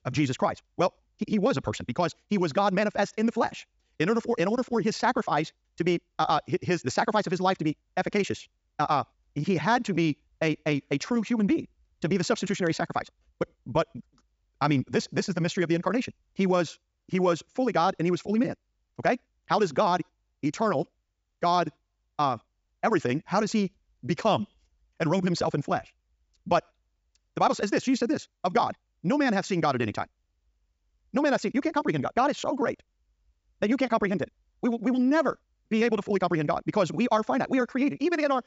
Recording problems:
wrong speed, natural pitch; too fast; 1.6 times normal speed
high frequencies cut off; noticeable; nothing above 8 kHz

